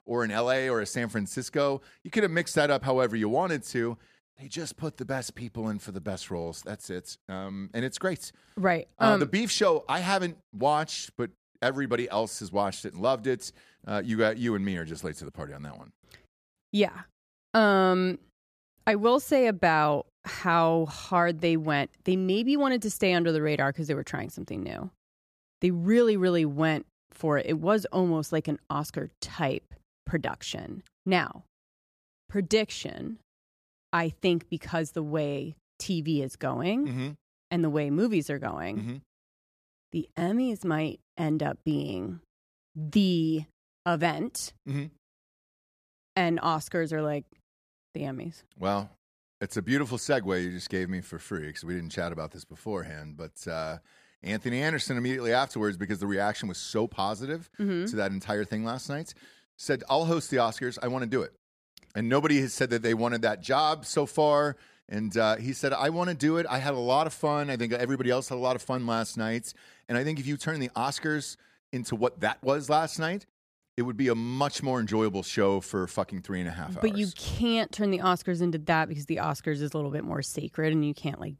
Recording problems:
none

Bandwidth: 14.5 kHz